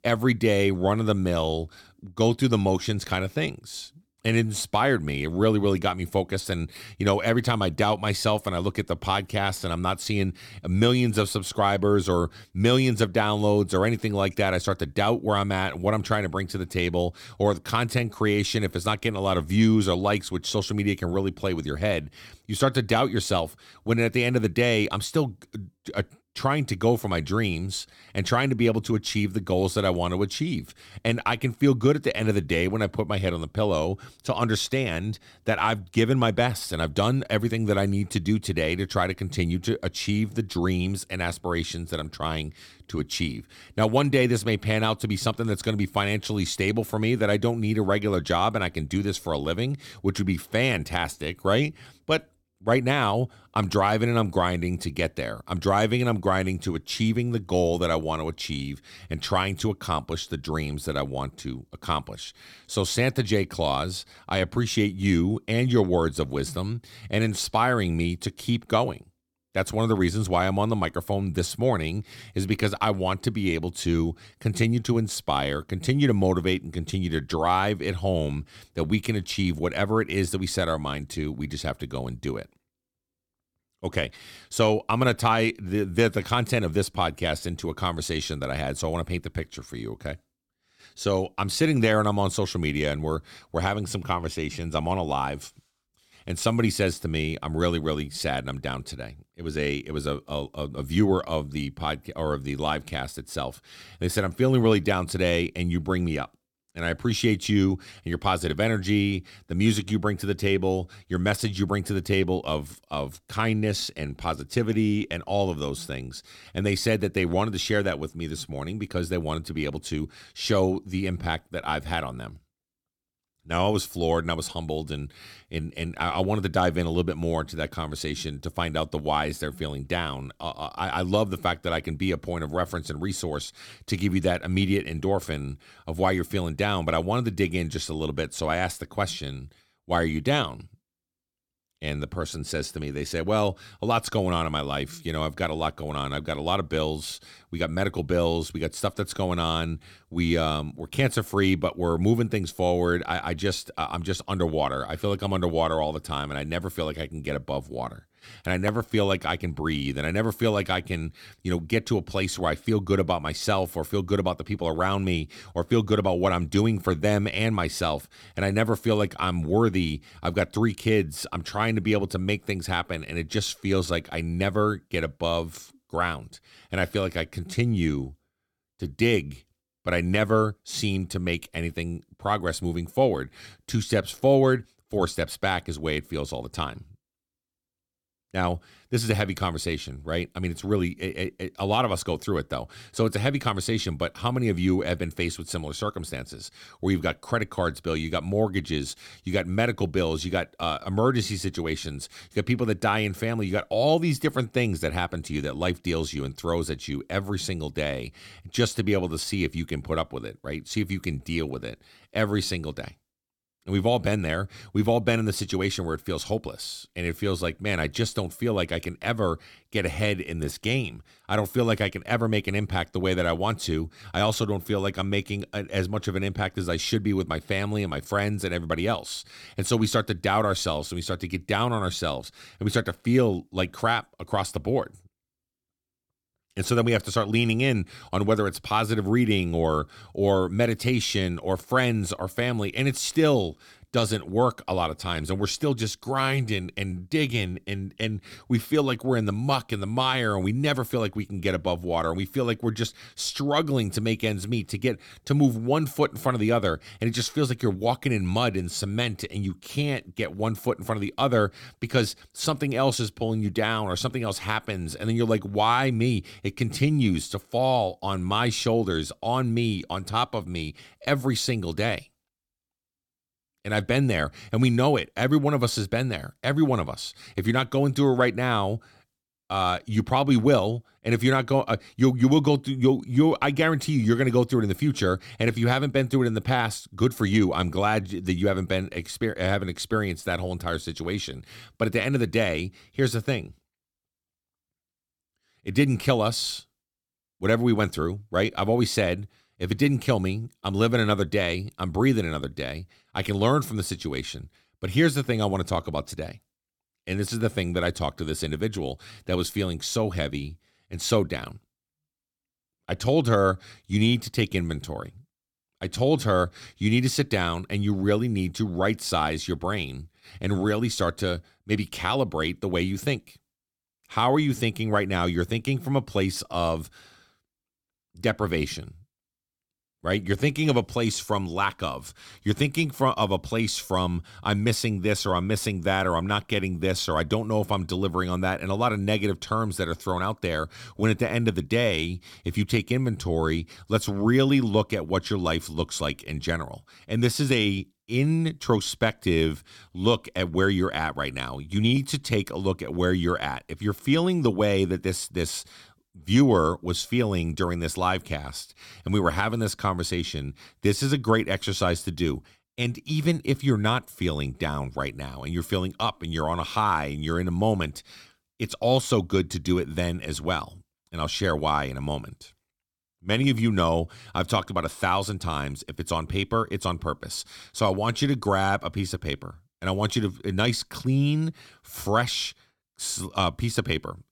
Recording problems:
none

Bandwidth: 17 kHz